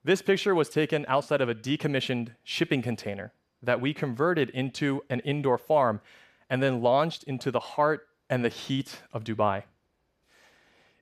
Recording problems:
none

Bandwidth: 14 kHz